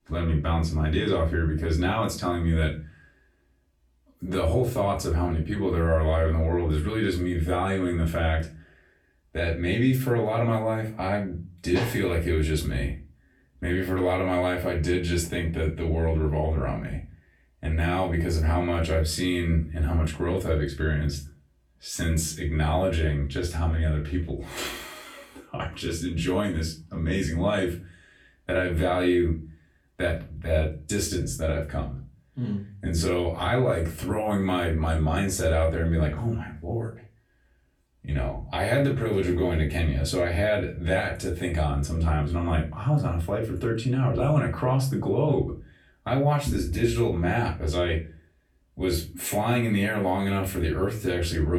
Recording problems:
off-mic speech; far
room echo; slight; dies away in 0.3 s
abrupt cut into speech; at the end

